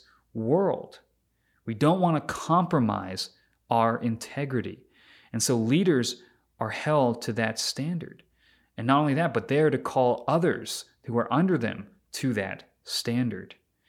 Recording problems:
none

